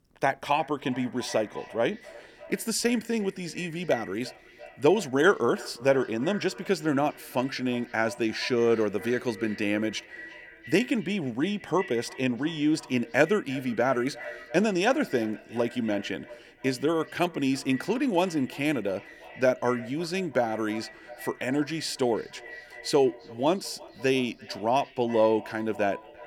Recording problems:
echo of what is said; noticeable; throughout; 340 ms later, 15 dB below the speech

